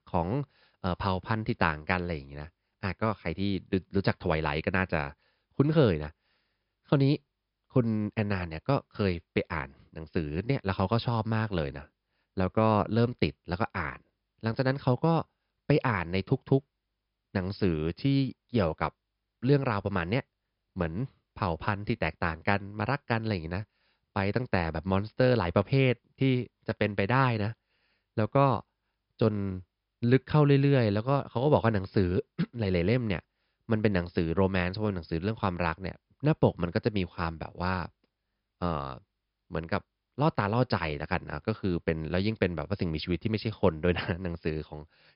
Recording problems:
high frequencies cut off; noticeable; nothing above 5.5 kHz

